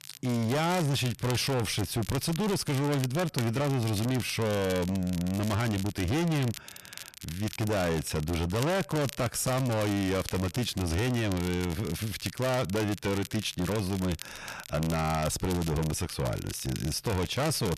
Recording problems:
distortion; heavy; 26% of the sound clipped
crackle, like an old record; noticeable; 15 dB below the speech

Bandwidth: 14 kHz